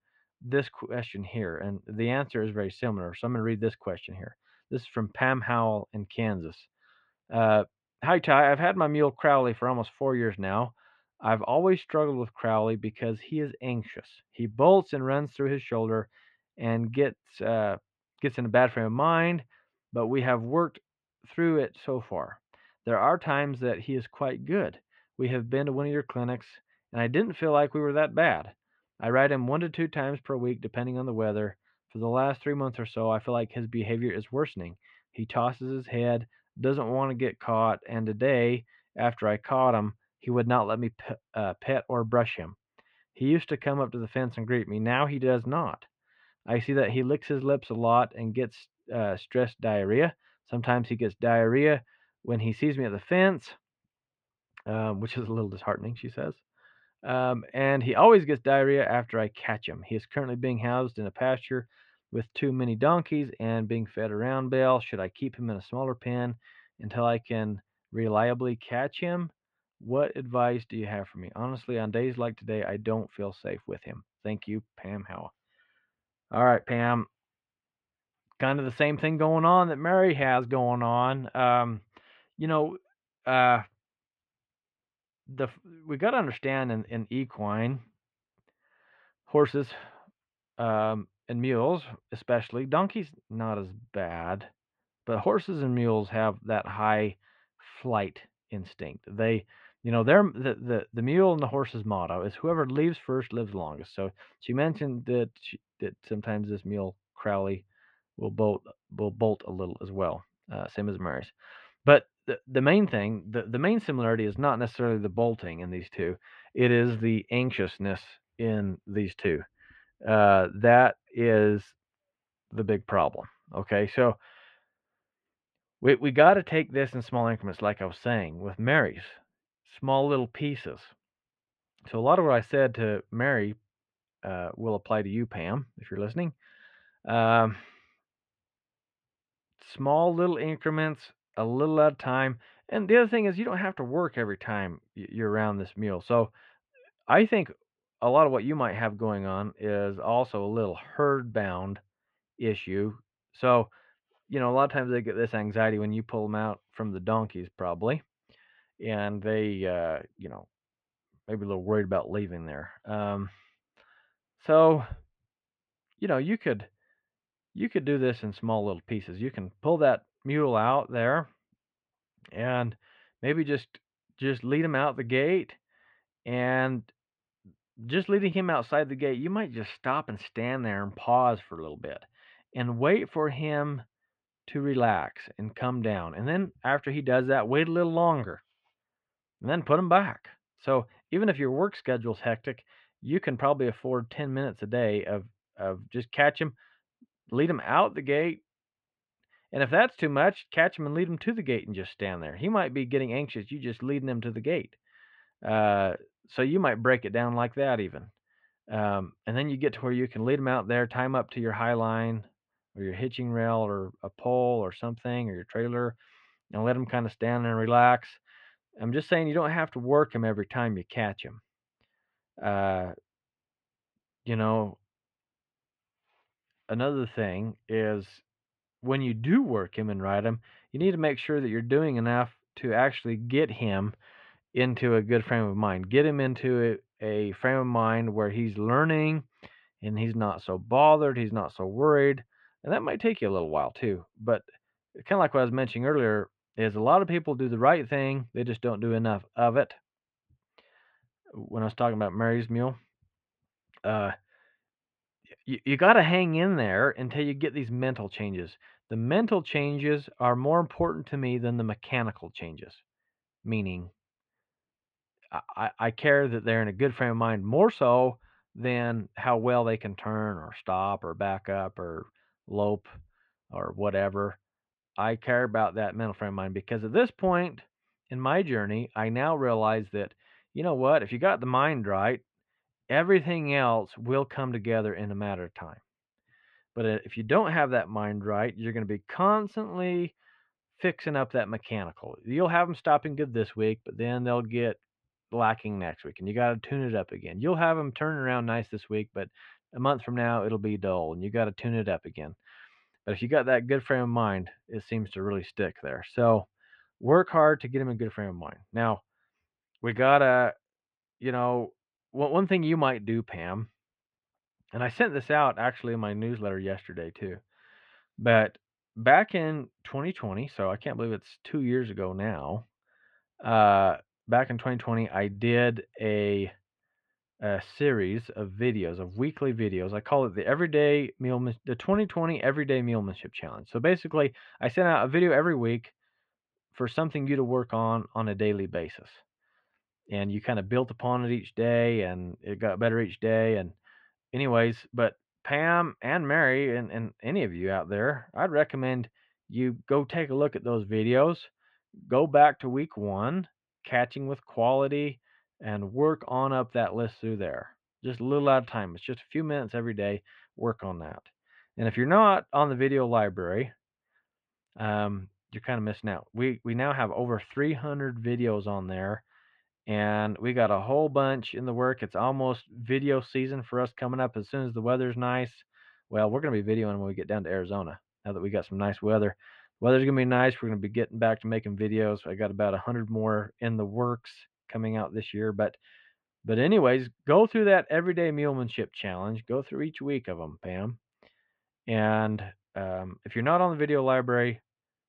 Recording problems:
muffled; very; fading above 3 kHz

